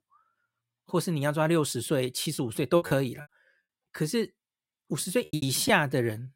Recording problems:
choppy; very; 8% of the speech affected

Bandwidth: 16 kHz